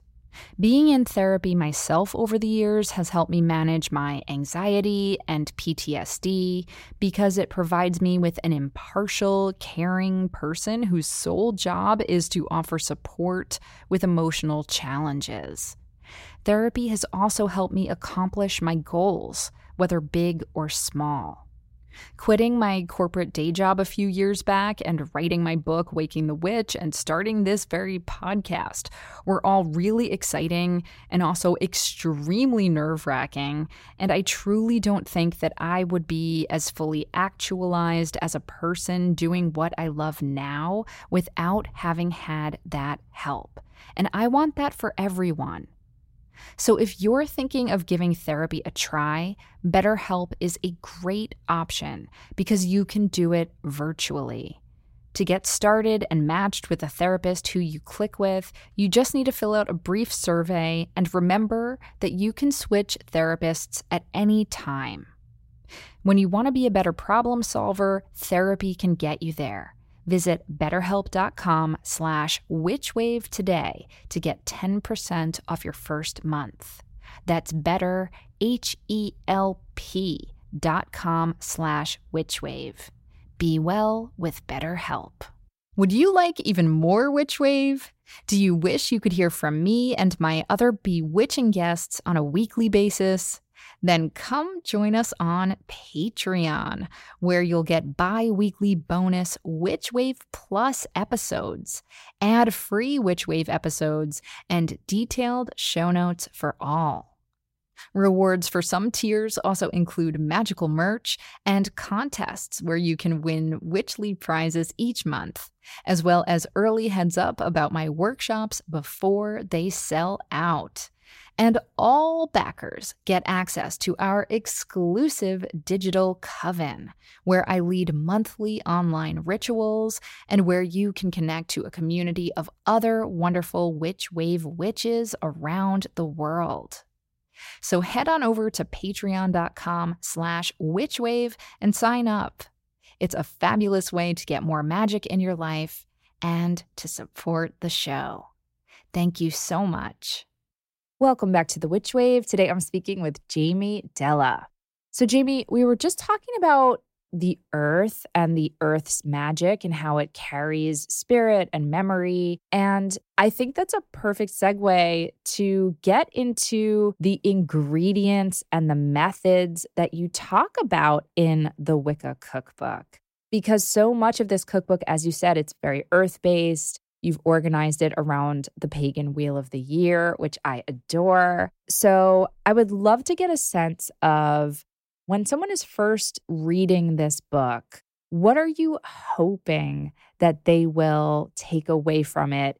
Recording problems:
none

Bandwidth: 16 kHz